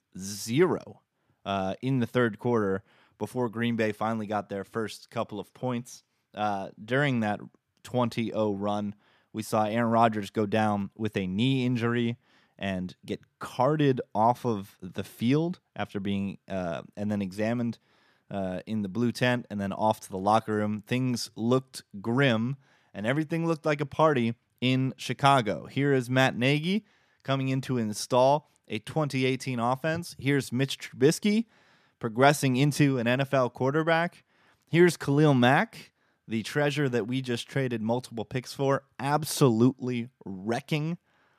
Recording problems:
none

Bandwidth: 14.5 kHz